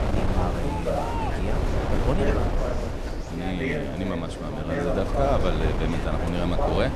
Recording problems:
wind noise on the microphone; heavy; 2 dB below the speech
chatter from many people; loud; throughout; 2 dB below the speech

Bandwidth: 13.5 kHz